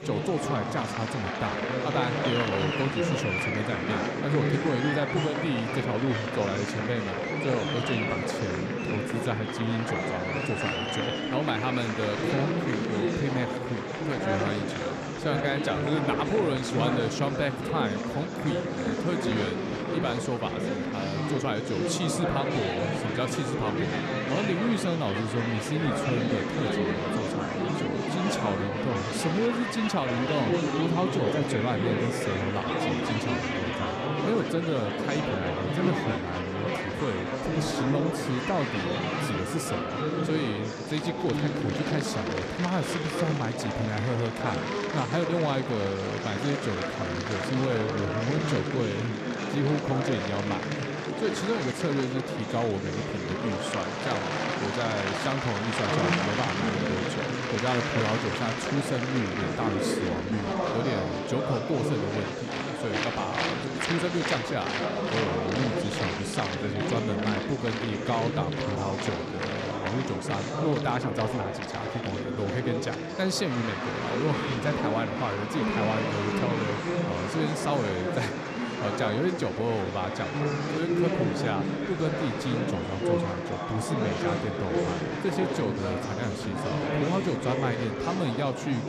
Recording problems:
murmuring crowd; very loud; throughout; 2 dB above the speech

